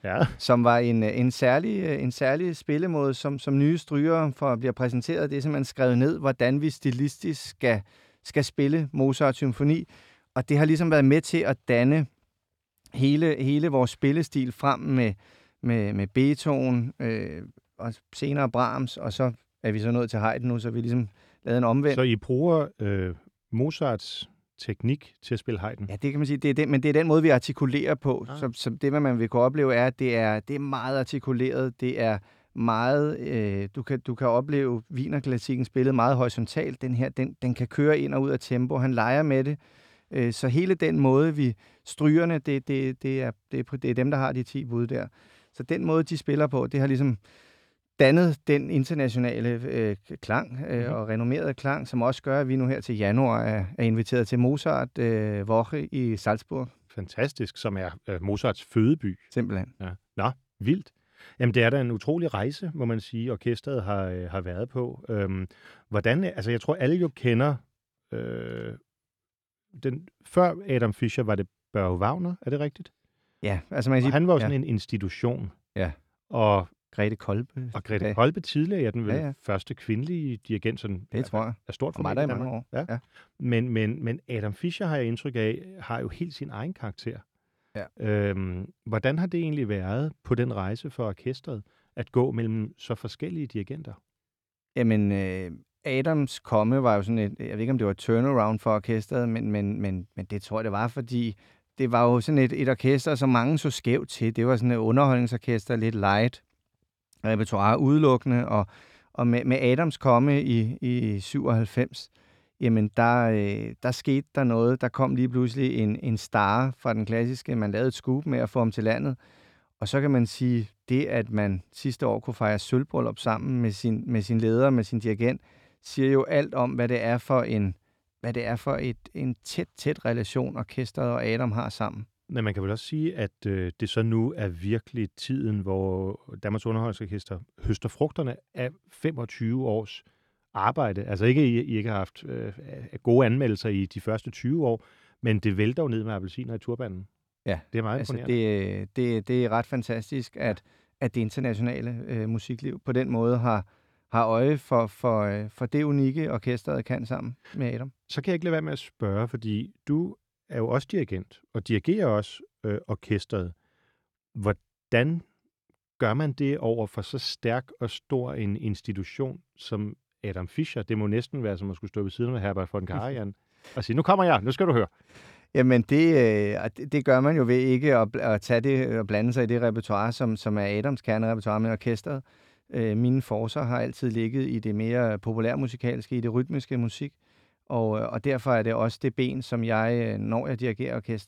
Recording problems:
none

